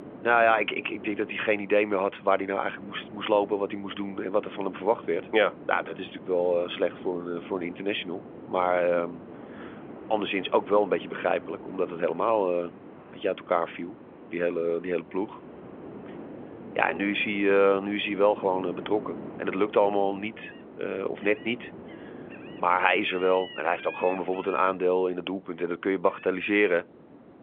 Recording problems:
phone-call audio; nothing above 3.5 kHz
animal sounds; noticeable; throughout; 20 dB below the speech
wind noise on the microphone; occasional gusts; 20 dB below the speech
traffic noise; faint; until 17 s; 30 dB below the speech

